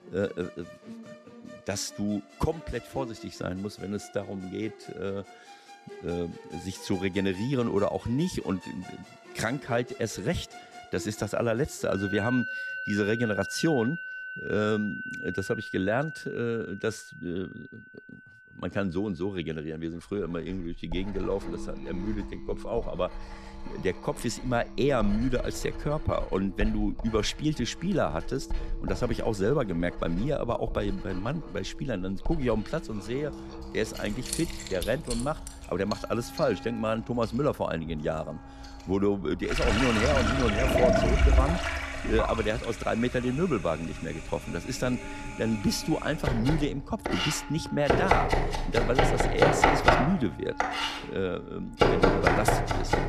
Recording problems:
household noises; very loud; from 20 s on; 1 dB above the speech
background music; noticeable; throughout; 15 dB below the speech

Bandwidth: 14 kHz